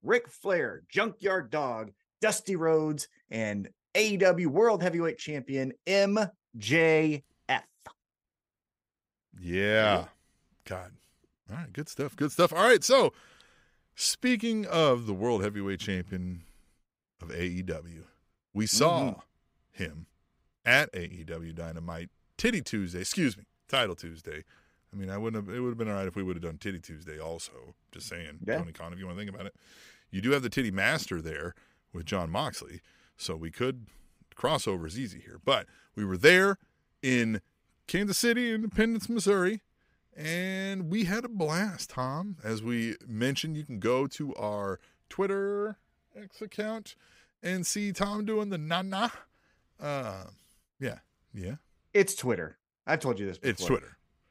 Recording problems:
none

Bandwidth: 15.5 kHz